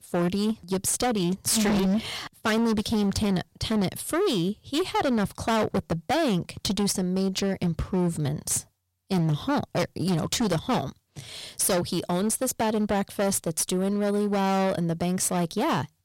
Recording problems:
distortion; heavy; 19% of the sound clipped

